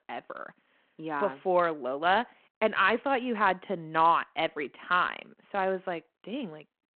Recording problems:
phone-call audio

